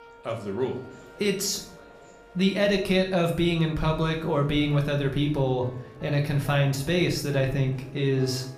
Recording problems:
room echo; slight; dies away in 0.5 s
off-mic speech; somewhat distant
background music; faint; throughout; 25 dB below the speech
murmuring crowd; faint; throughout; 25 dB below the speech

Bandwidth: 14.5 kHz